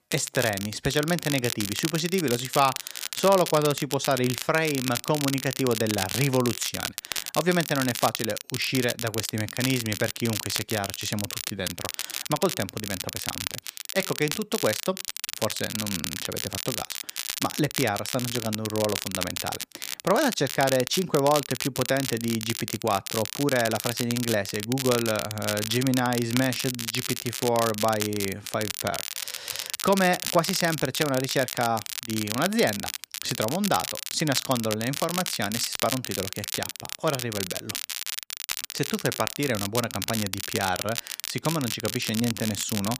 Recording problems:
crackle, like an old record; loud; 4 dB below the speech

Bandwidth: 15 kHz